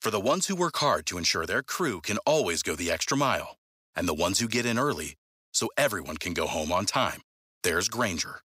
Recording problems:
thin; very slightly; fading below 450 Hz

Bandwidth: 15.5 kHz